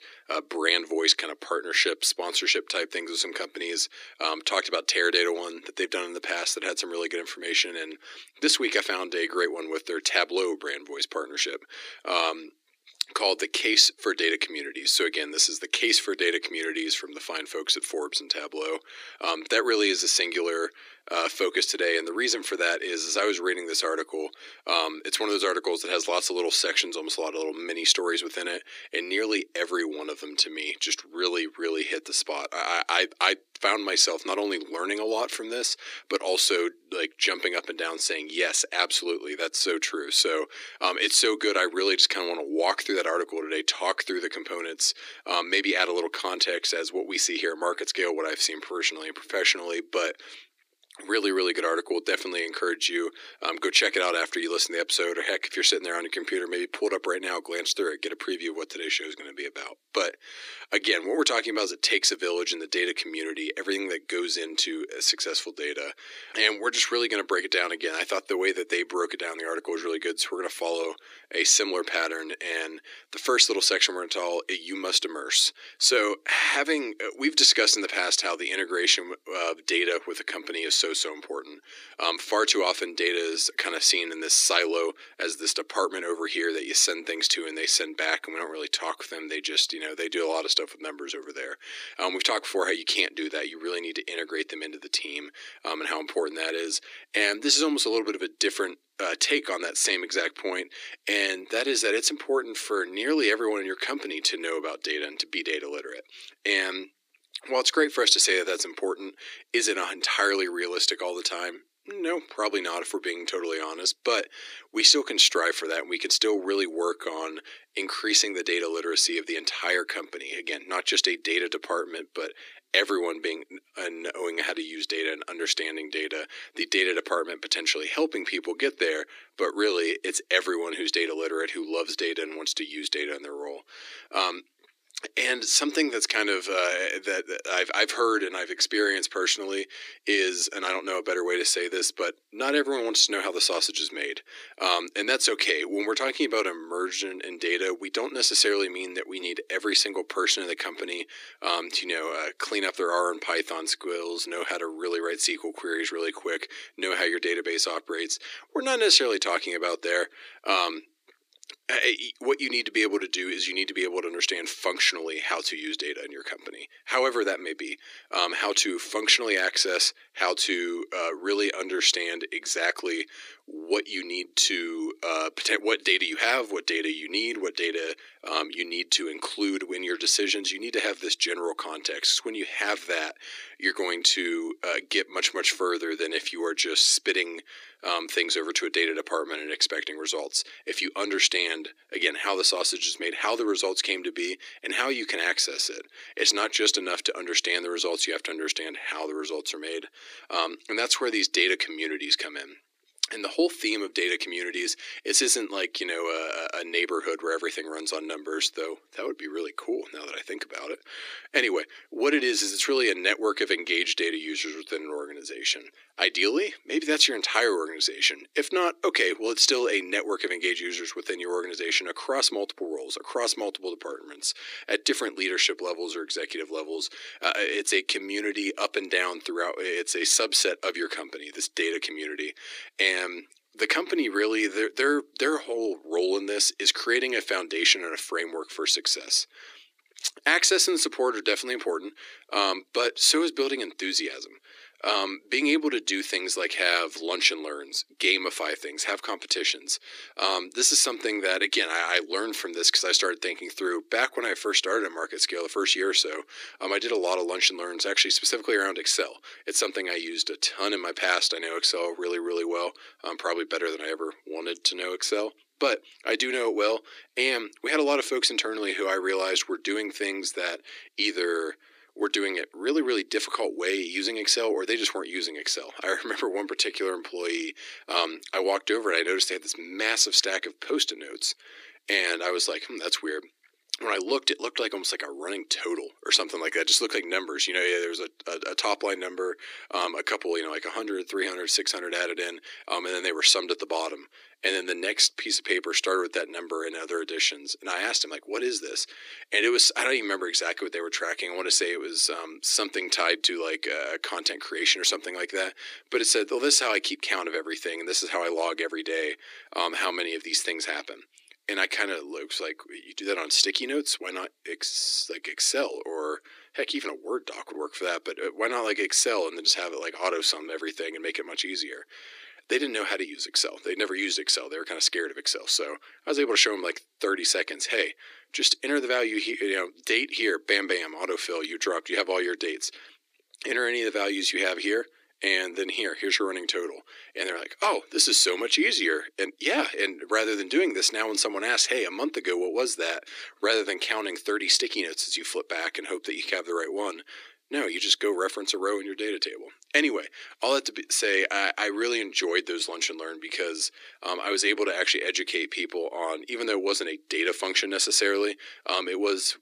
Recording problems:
thin; very; fading below 300 Hz

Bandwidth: 14.5 kHz